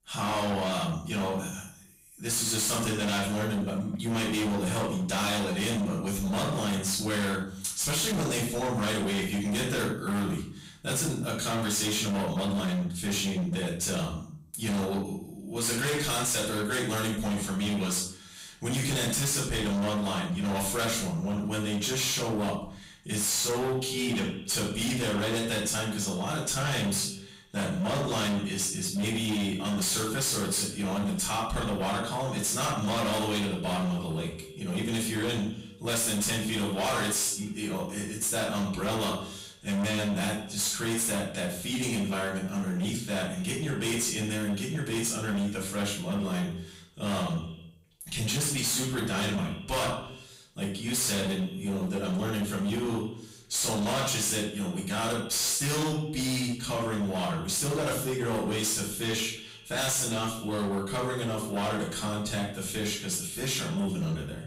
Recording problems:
distortion; heavy; 25% of the sound clipped
off-mic speech; far
echo of what is said; noticeable; from 23 s on; 100 ms later, 15 dB below the speech
room echo; noticeable; dies away in 0.5 s

